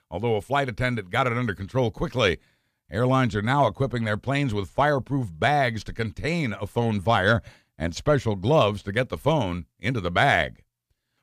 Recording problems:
none

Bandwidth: 15 kHz